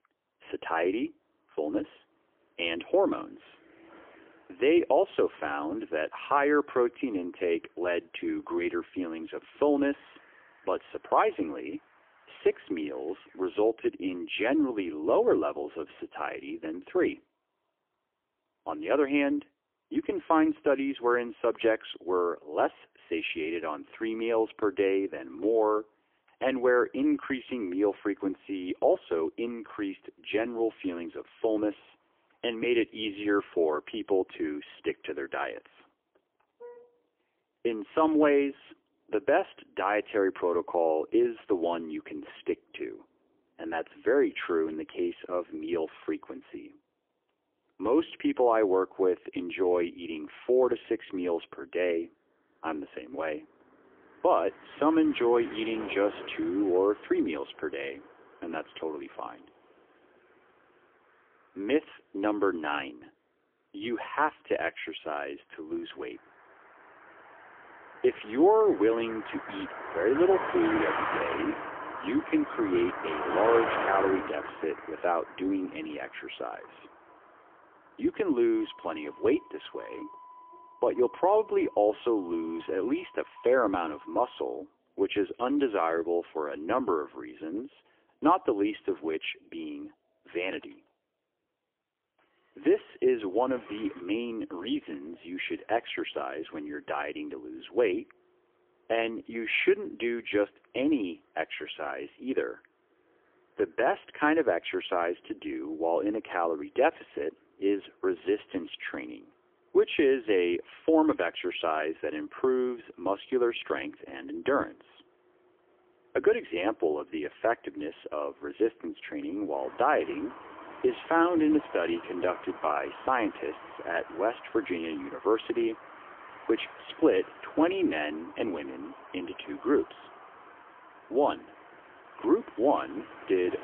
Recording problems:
phone-call audio; poor line; nothing above 3.5 kHz
traffic noise; noticeable; throughout; 10 dB below the speech

